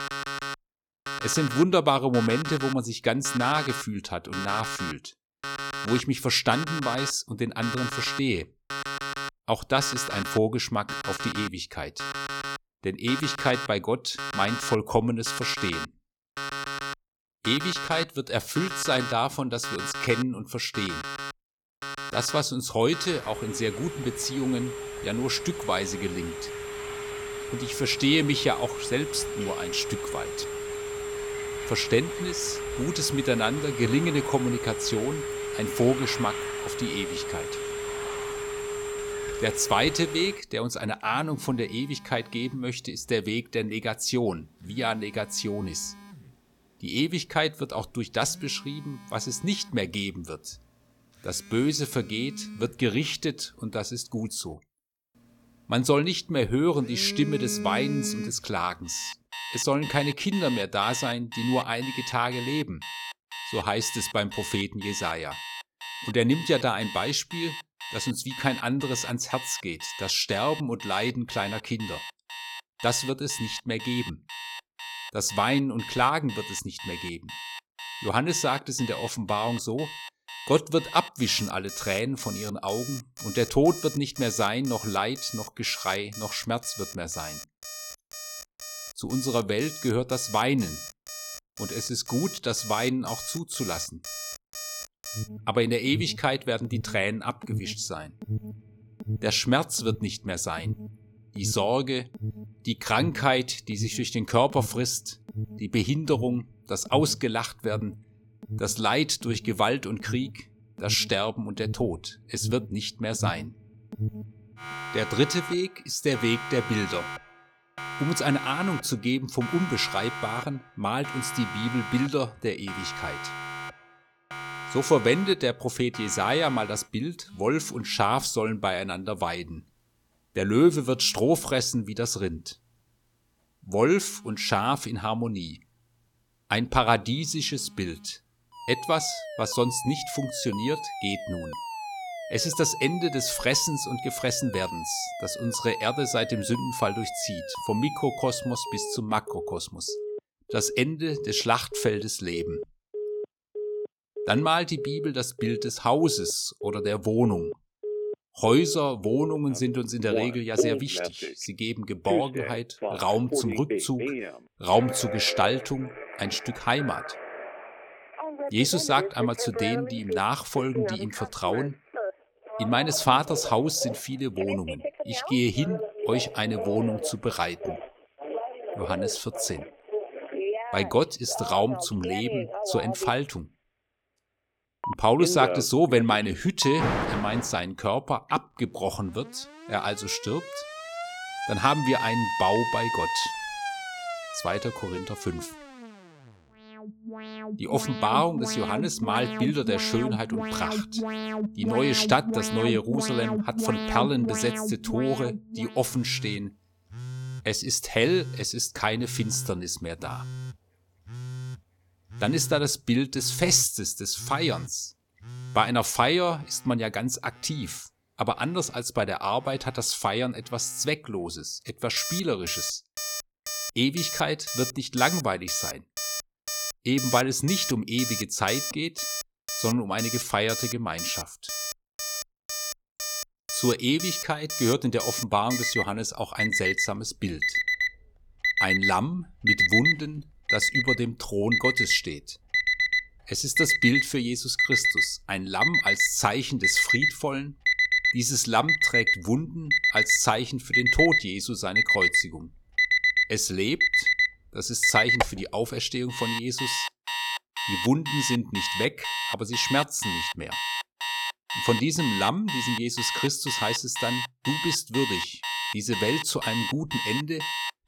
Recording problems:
alarms or sirens; loud; throughout; 4 dB below the speech

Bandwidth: 17.5 kHz